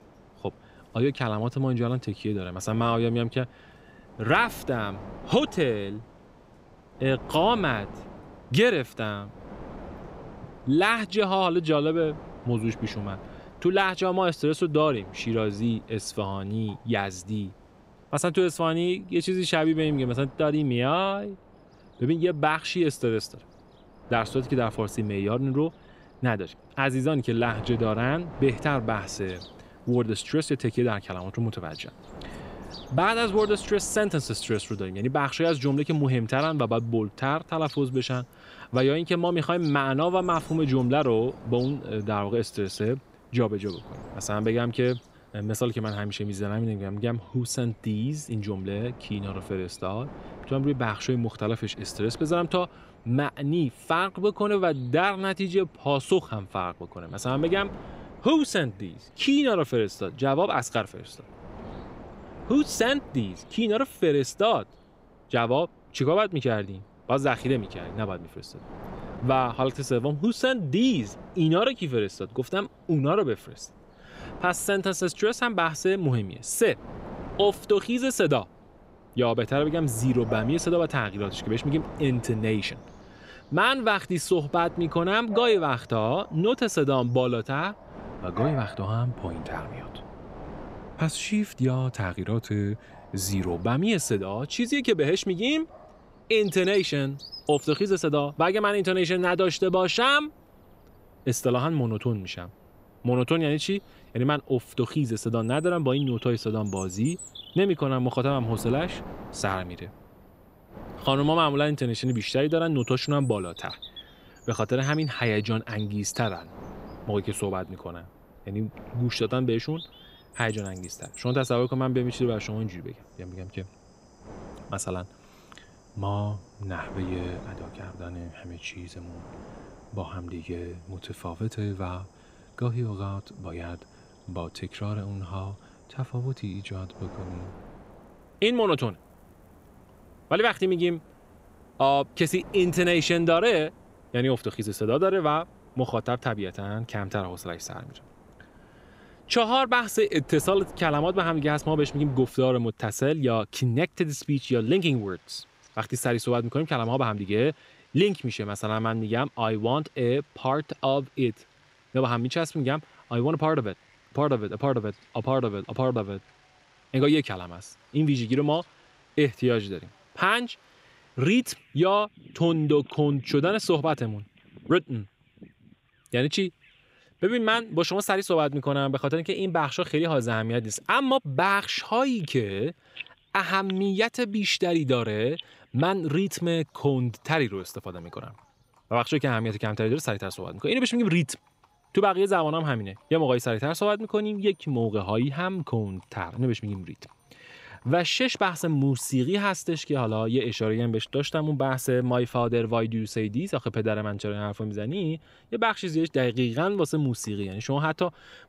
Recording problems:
wind noise on the microphone; occasional gusts; until 2:32; 20 dB below the speech
animal sounds; faint; throughout; 25 dB below the speech

